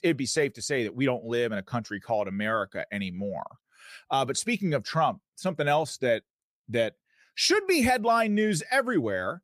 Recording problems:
none

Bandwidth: 15 kHz